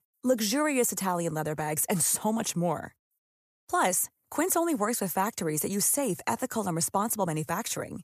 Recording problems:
none

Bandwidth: 14.5 kHz